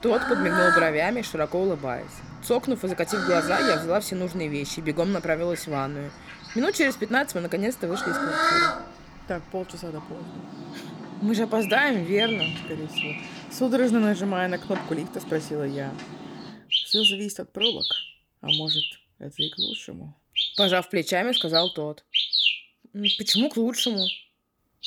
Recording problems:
animal sounds; very loud; throughout; 2 dB above the speech

